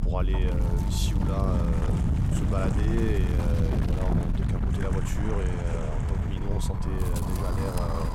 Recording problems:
wind noise on the microphone; heavy; as loud as the speech

